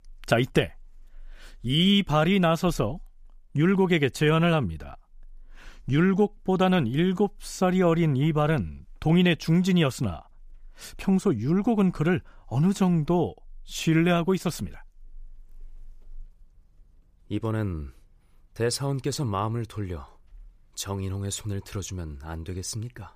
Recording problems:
none

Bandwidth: 15 kHz